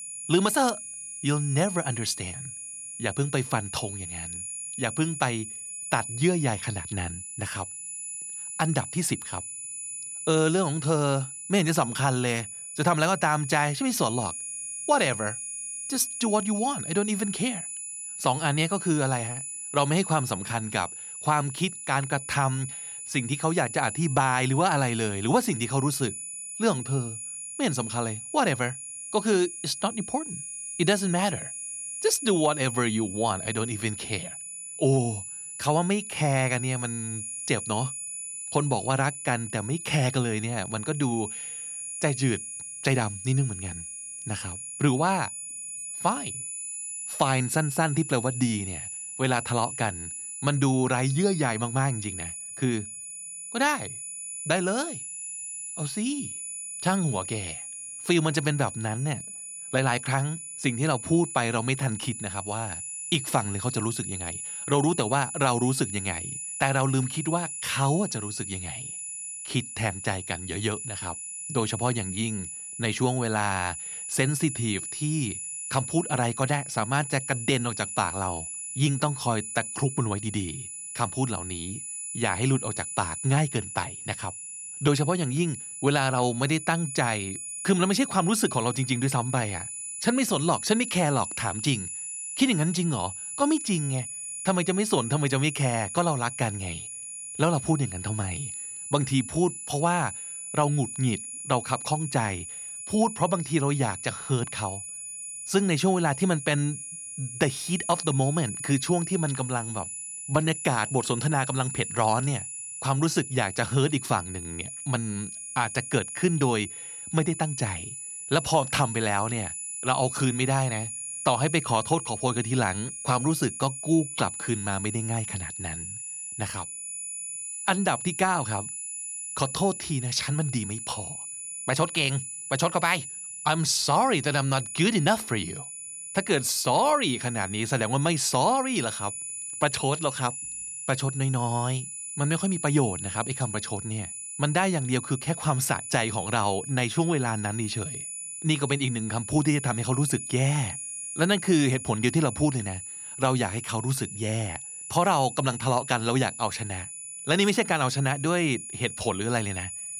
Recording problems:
high-pitched whine; loud; throughout; 10 kHz, 7 dB below the speech

